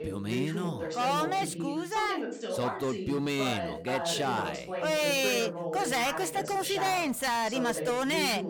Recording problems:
voice in the background; loud; throughout; 6 dB below the speech

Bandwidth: 18.5 kHz